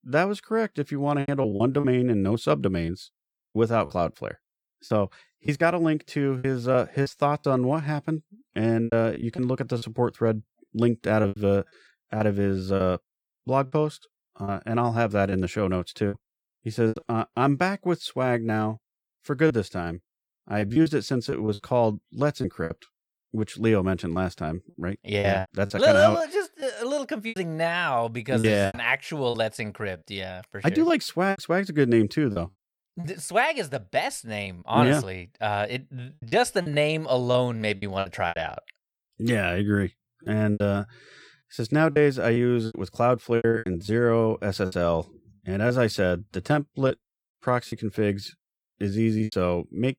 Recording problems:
choppy; very; 8% of the speech affected

